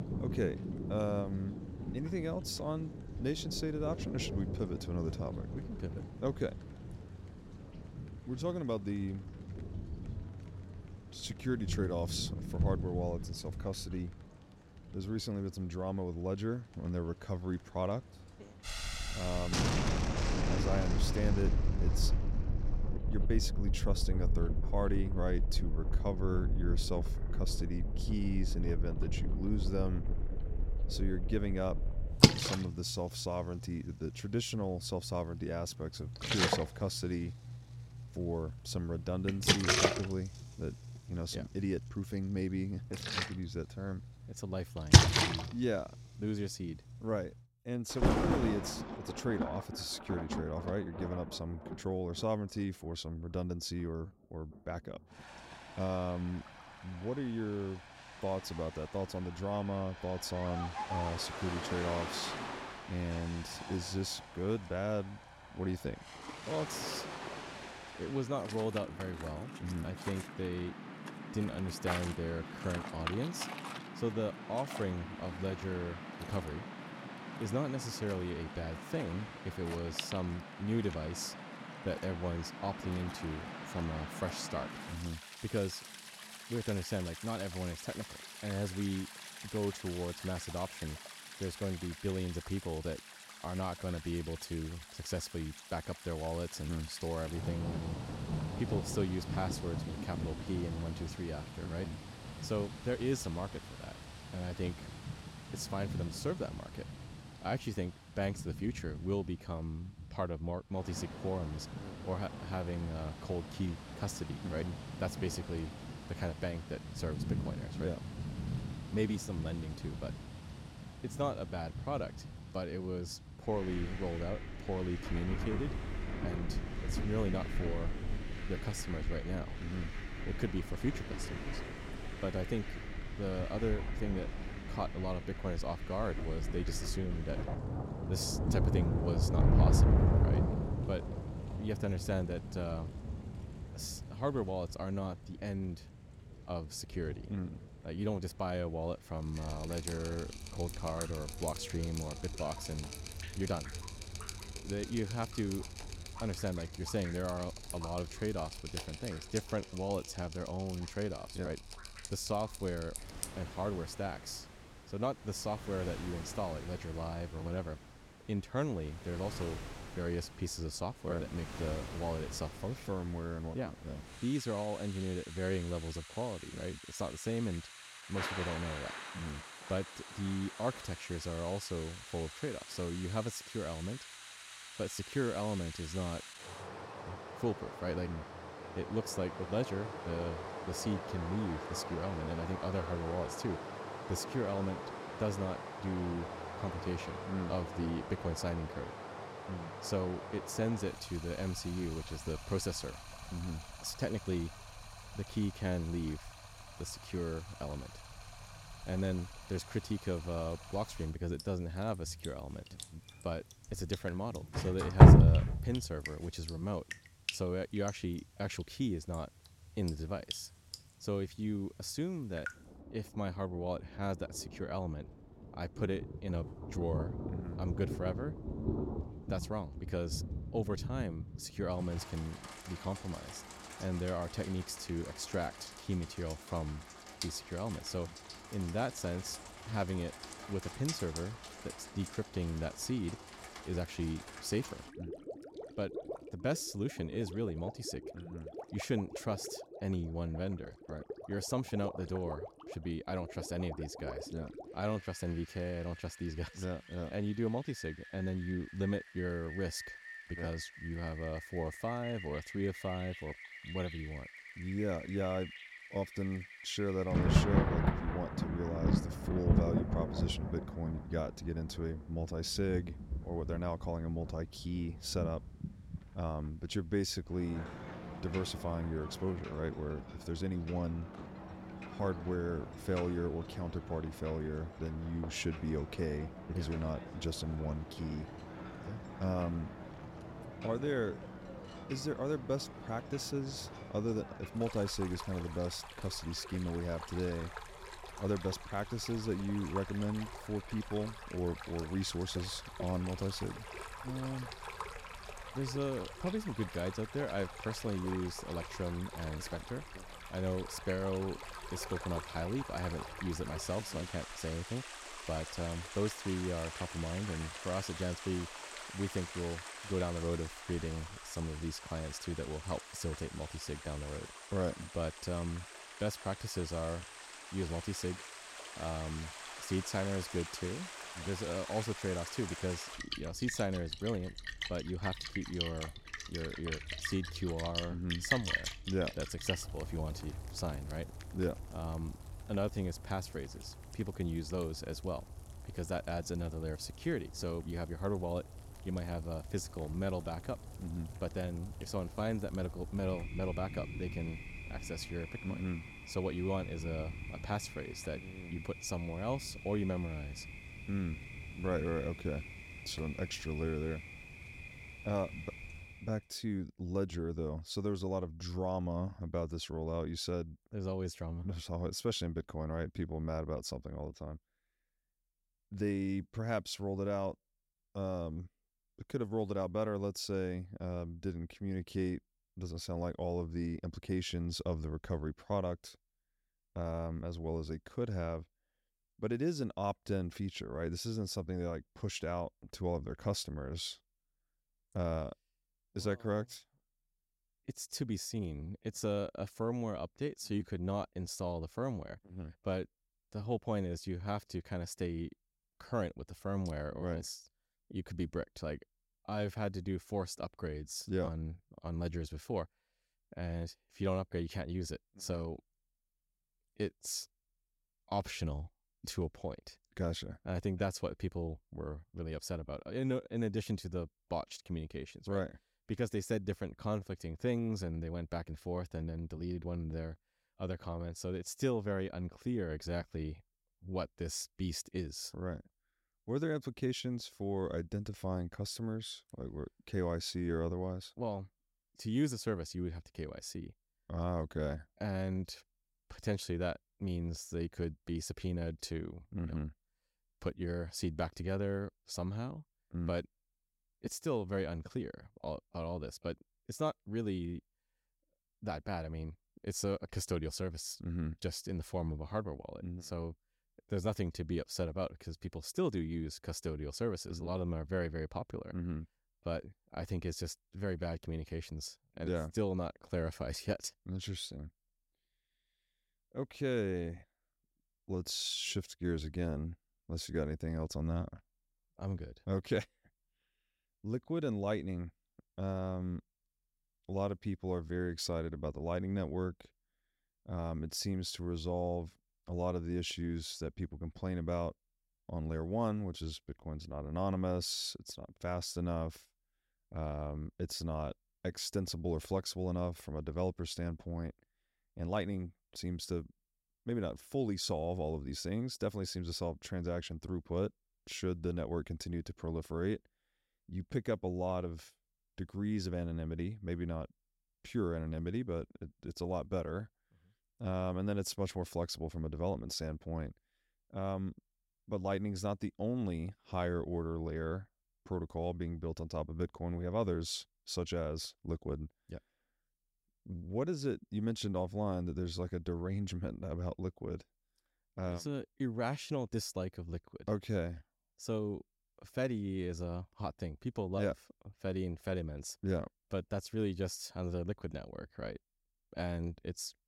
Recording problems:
rain or running water; loud; until 6:06; 1 dB below the speech

